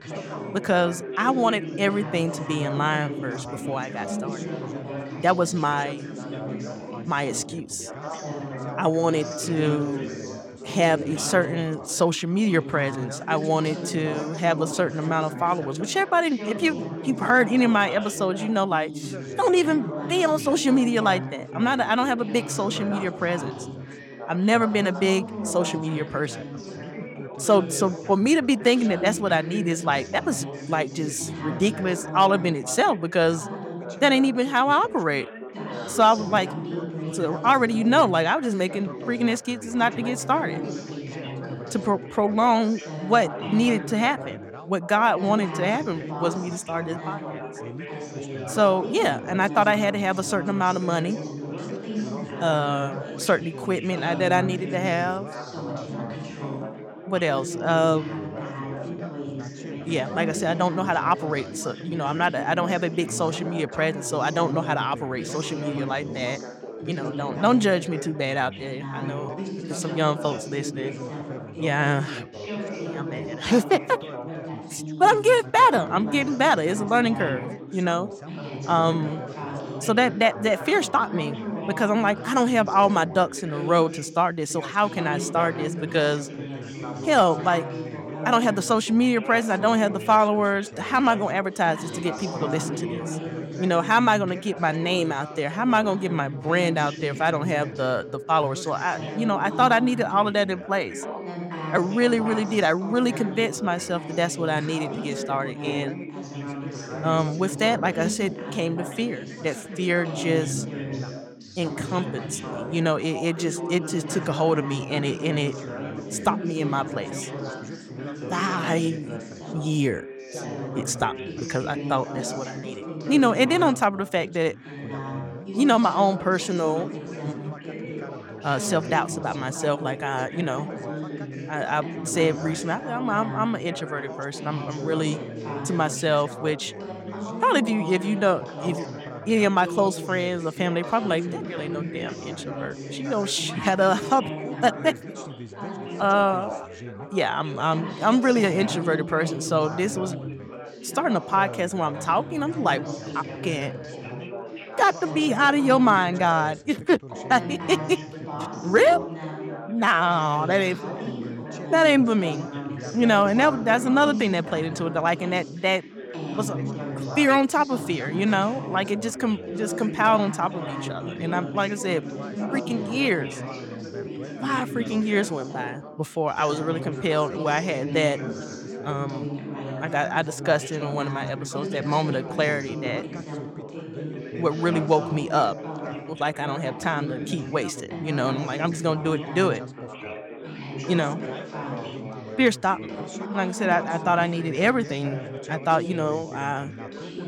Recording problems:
background chatter; loud; throughout; 4 voices, 10 dB below the speech

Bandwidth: 17 kHz